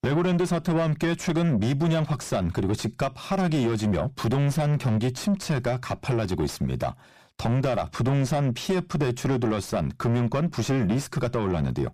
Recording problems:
distortion; heavy; 7 dB below the speech

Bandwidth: 14.5 kHz